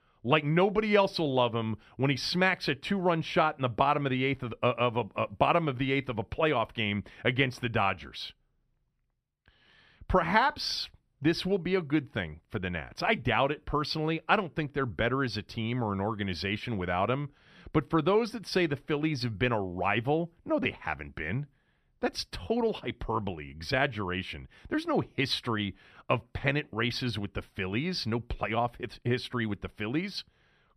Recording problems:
none

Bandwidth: 14.5 kHz